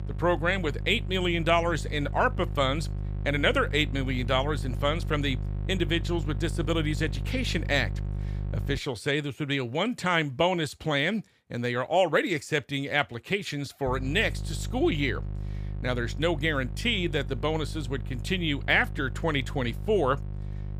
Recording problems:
electrical hum; noticeable; until 9 s and from 14 s on; 50 Hz, 20 dB below the speech

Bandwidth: 15 kHz